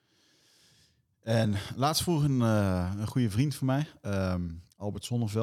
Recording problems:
abrupt cut into speech; at the end

